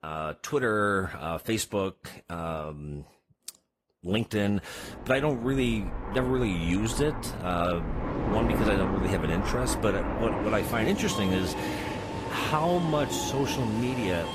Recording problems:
garbled, watery; slightly; nothing above 14.5 kHz
train or aircraft noise; loud; from 5 s on; 4 dB below the speech

